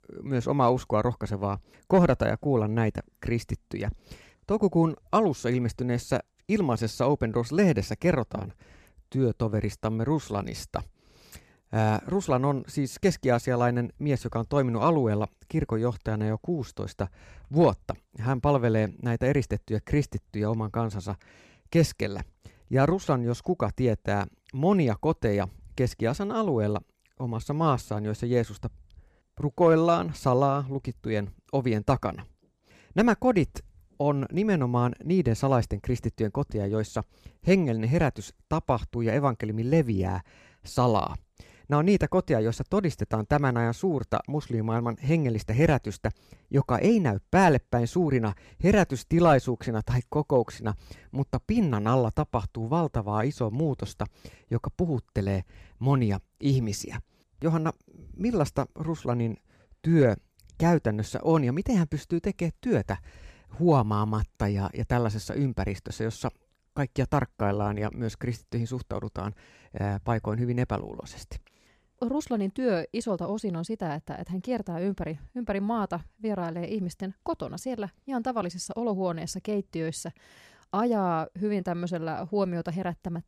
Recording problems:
none

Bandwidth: 14.5 kHz